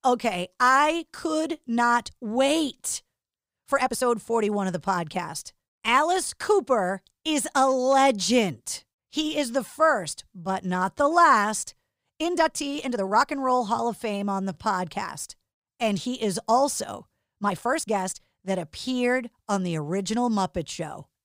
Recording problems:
uneven, jittery; strongly; from 2 to 18 s

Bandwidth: 15.5 kHz